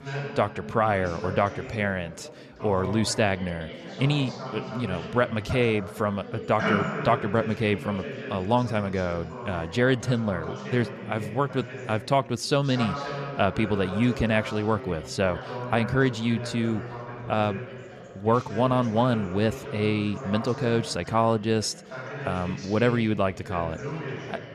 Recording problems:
background chatter; loud; throughout; 4 voices, 9 dB below the speech

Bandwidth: 14.5 kHz